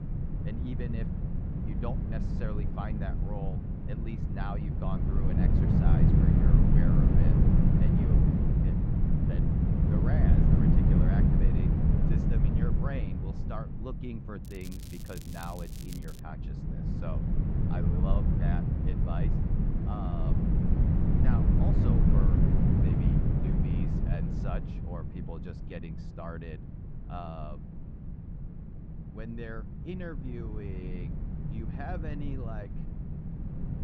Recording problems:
muffled; very slightly; fading above 3.5 kHz
wind noise on the microphone; heavy; 5 dB above the speech
crackling; loud; from 14 to 16 s; 7 dB below the speech
electrical hum; faint; throughout; 50 Hz, 25 dB below the speech

